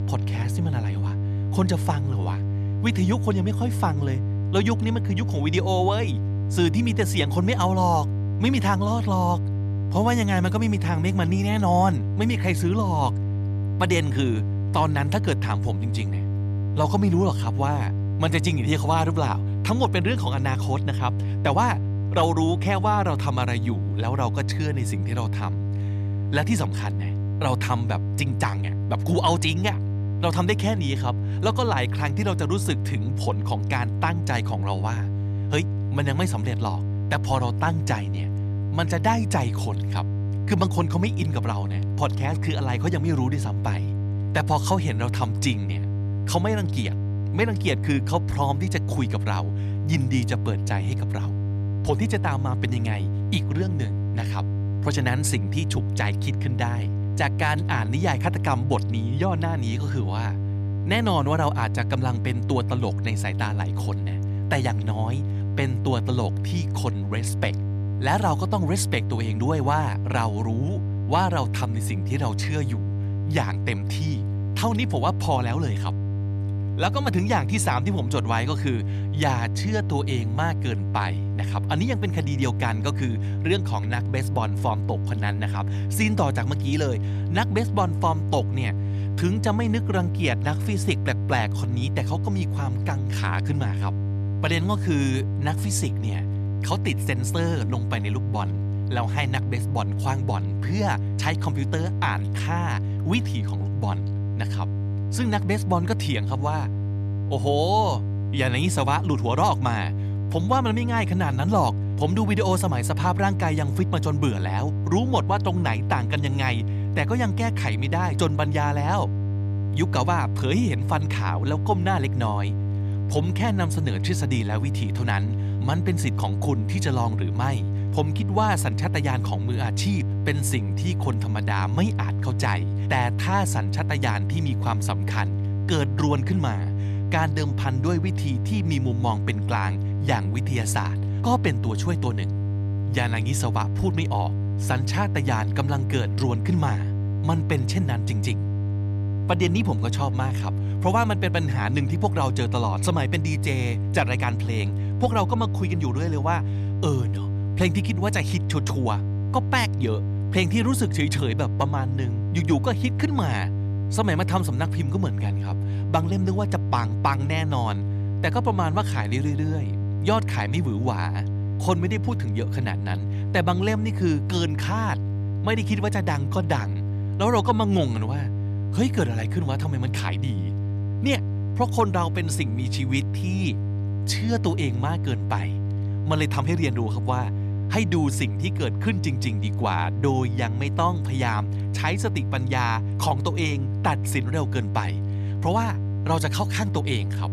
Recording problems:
electrical hum; noticeable; throughout; 50 Hz, 10 dB below the speech

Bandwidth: 14 kHz